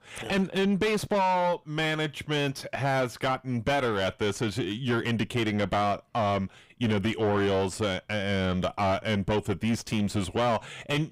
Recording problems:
distortion; heavy; 6 dB below the speech

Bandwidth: 15.5 kHz